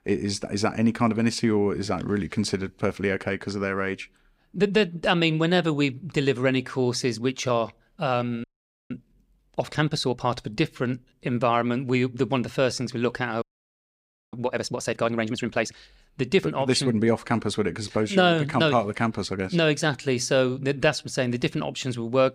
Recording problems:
audio freezing; at 8.5 s and at 13 s for 1 s

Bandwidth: 15.5 kHz